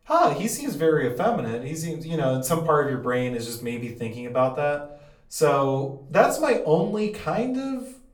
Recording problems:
off-mic speech; far
room echo; slight; dies away in 0.4 s

